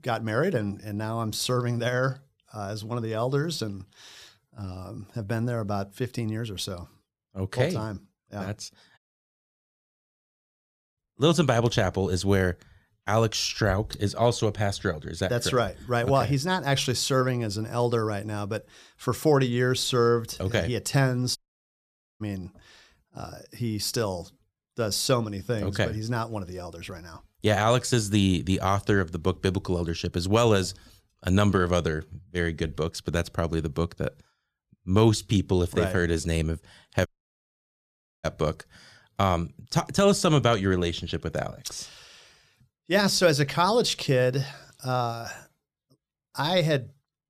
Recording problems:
audio cutting out; at 9 s for 2 s, at 21 s for 1 s and at 37 s for 1 s

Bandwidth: 14.5 kHz